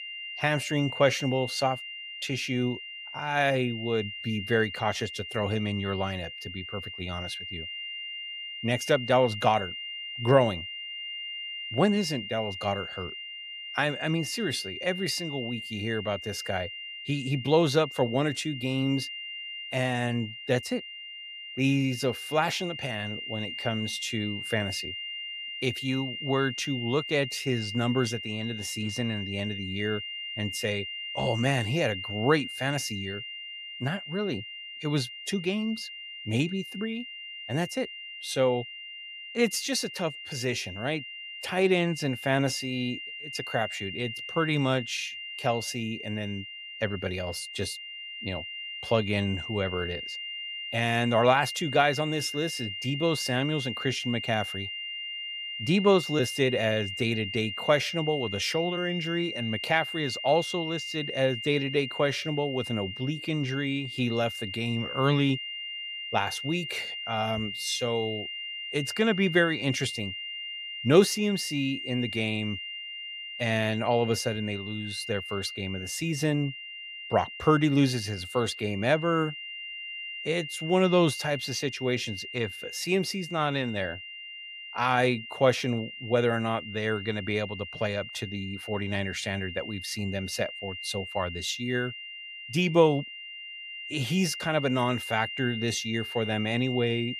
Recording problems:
high-pitched whine; loud; throughout; 3 kHz, 7 dB below the speech

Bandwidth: 15.5 kHz